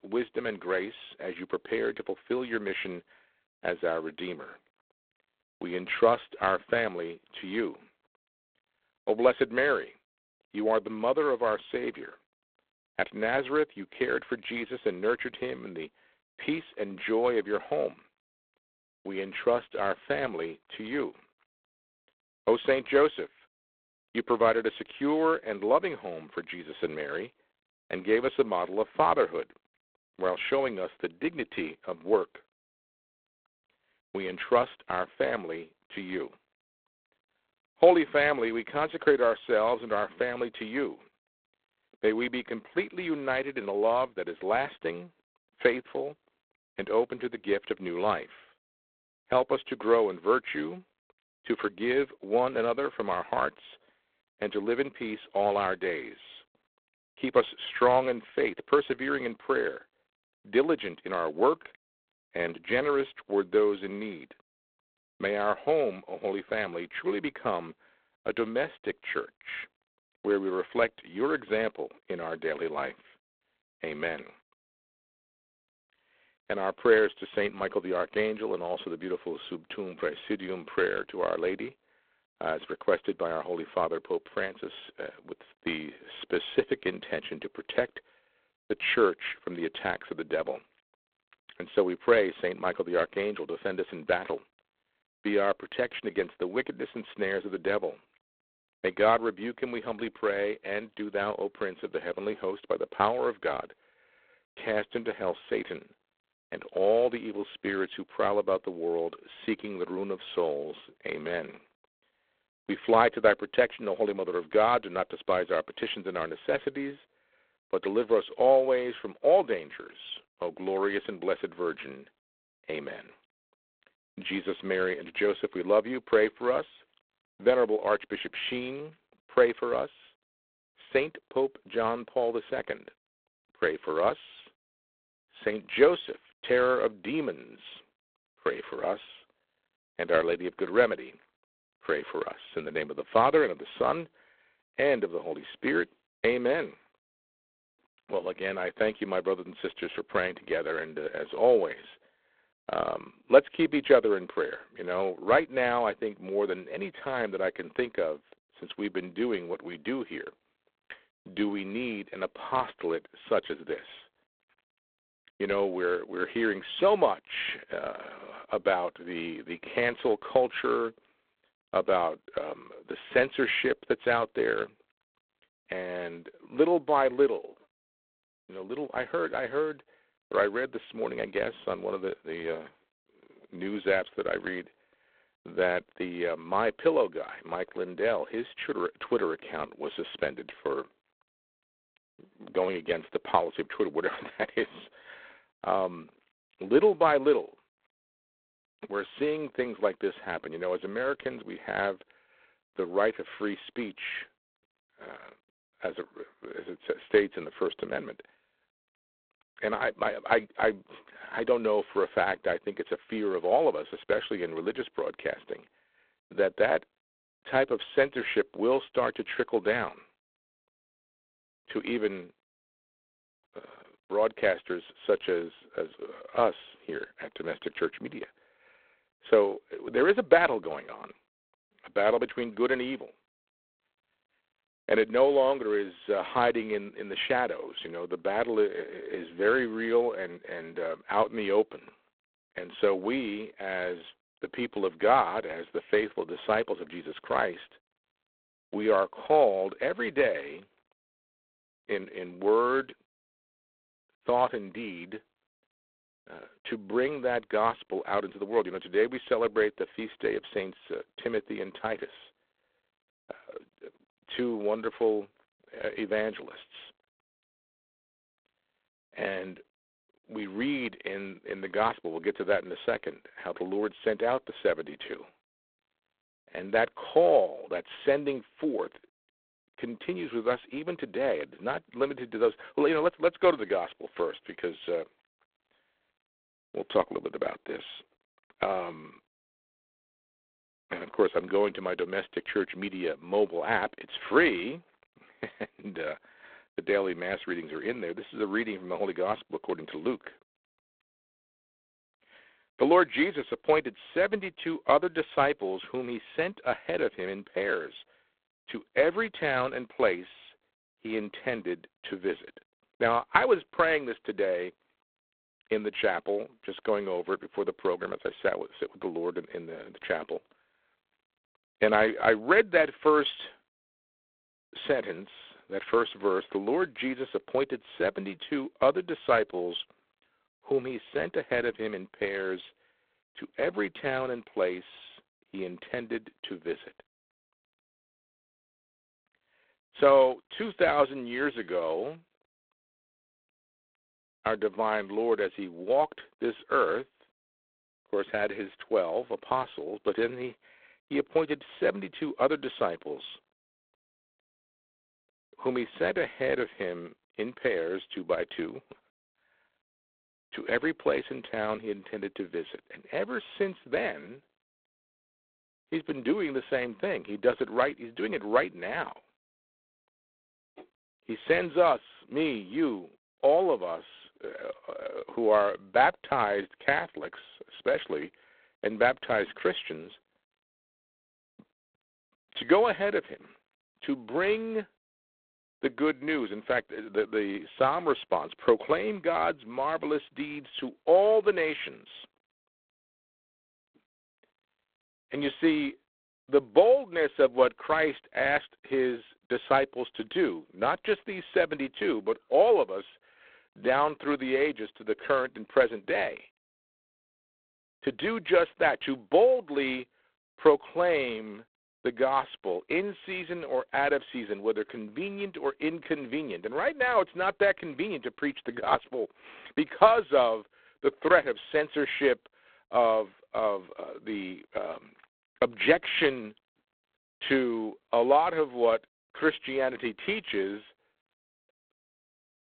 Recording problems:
phone-call audio; poor line; nothing above 3.5 kHz

